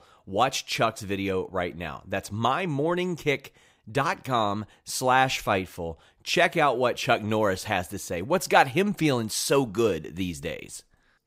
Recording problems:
none

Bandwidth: 15.5 kHz